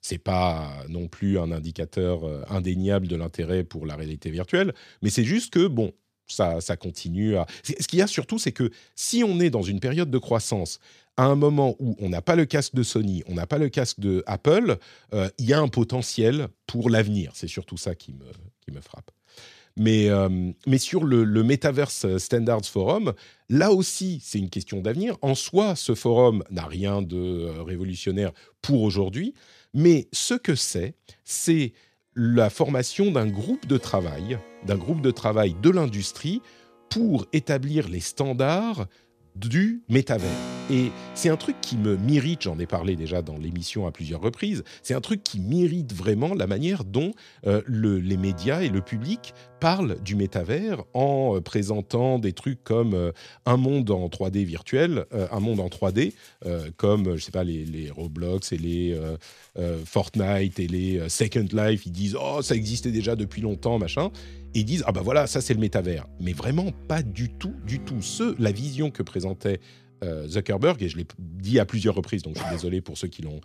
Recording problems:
background music; noticeable; from 33 s on; 20 dB below the speech

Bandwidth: 14.5 kHz